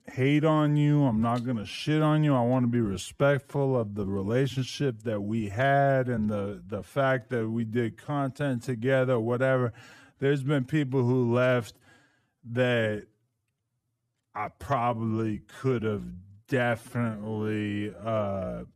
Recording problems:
wrong speed, natural pitch; too slow; 0.7 times normal speed

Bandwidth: 14.5 kHz